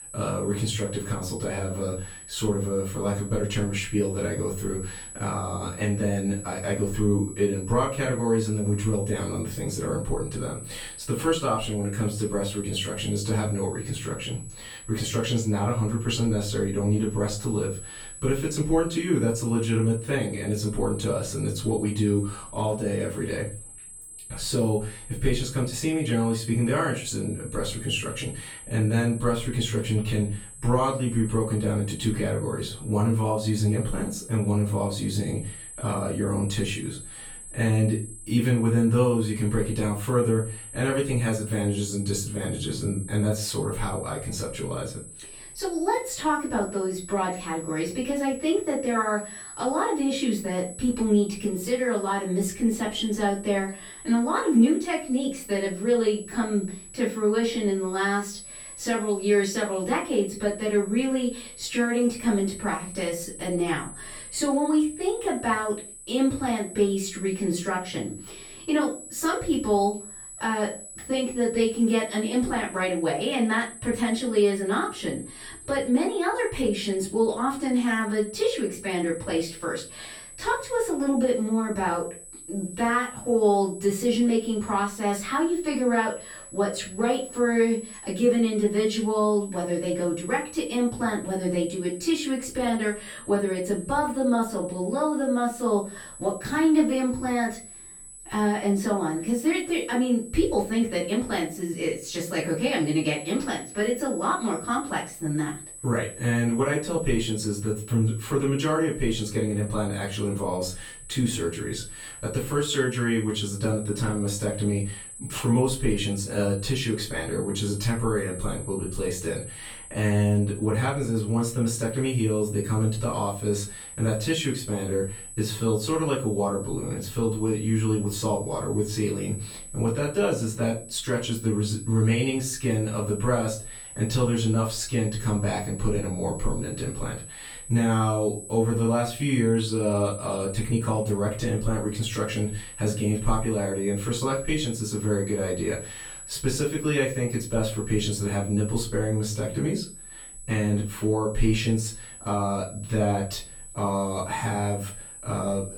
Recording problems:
off-mic speech; far
room echo; slight; dies away in 0.3 s
high-pitched whine; noticeable; throughout; 8 kHz, 15 dB below the speech

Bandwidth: 18 kHz